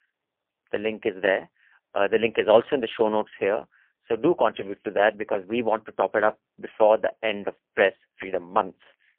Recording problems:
phone-call audio; poor line; nothing above 3 kHz

